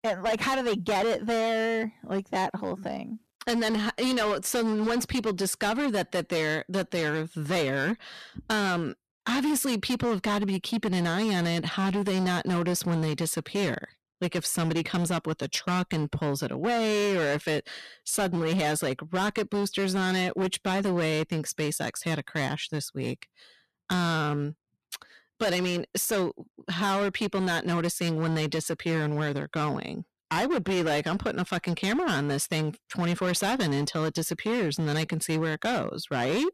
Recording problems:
distortion; heavy; 19% of the sound clipped

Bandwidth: 14 kHz